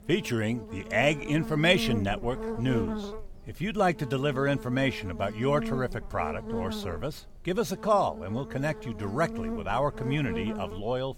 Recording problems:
electrical hum; noticeable; throughout; 50 Hz, 10 dB below the speech

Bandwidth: 18.5 kHz